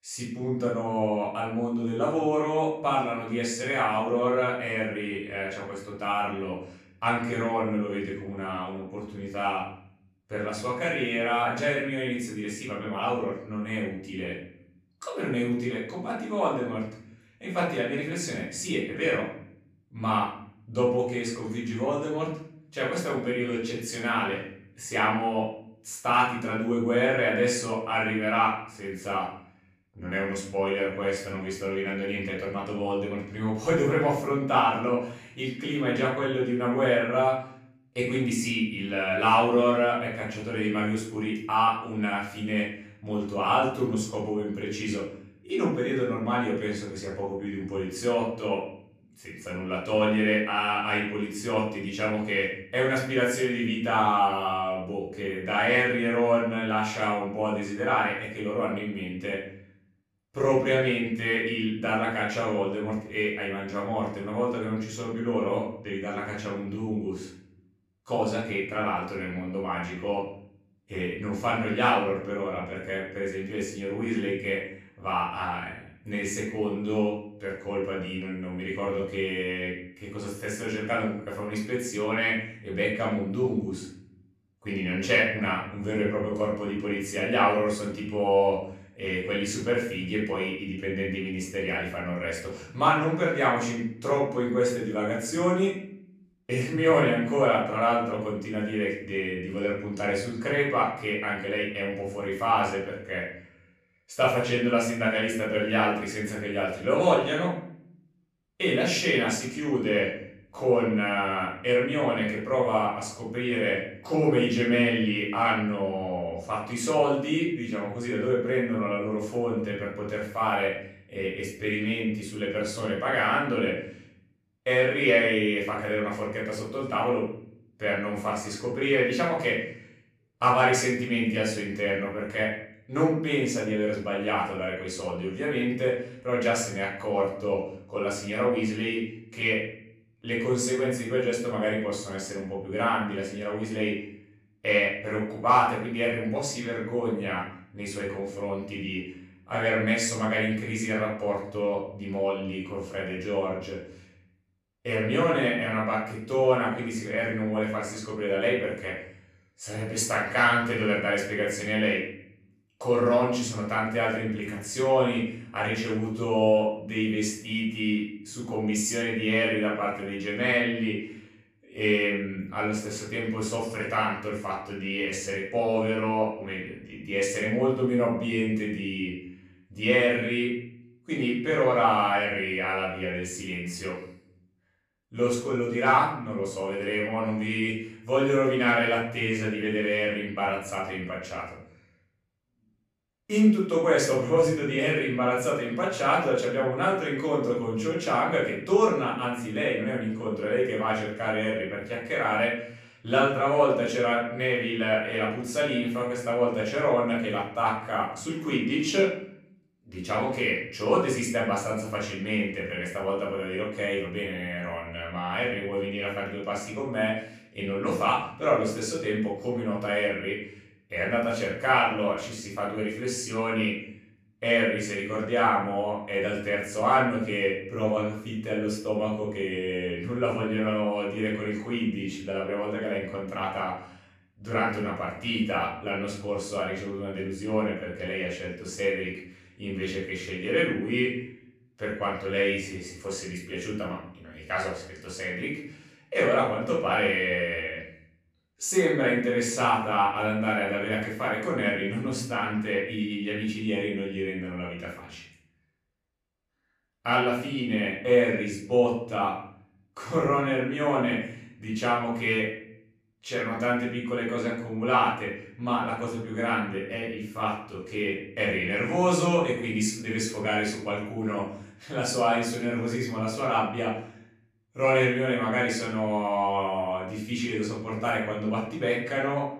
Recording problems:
off-mic speech; far
room echo; noticeable; dies away in 0.7 s

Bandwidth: 14.5 kHz